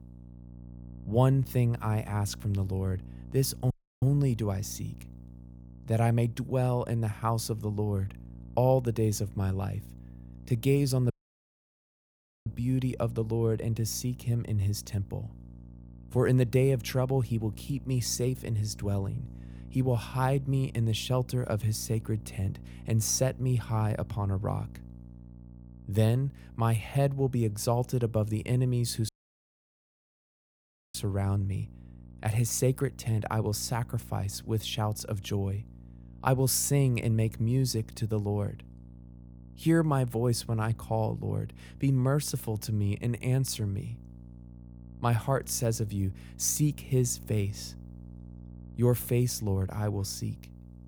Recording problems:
electrical hum; faint; throughout; 60 Hz, 25 dB below the speech
audio cutting out; at 3.5 s, at 11 s for 1.5 s and at 29 s for 2 s

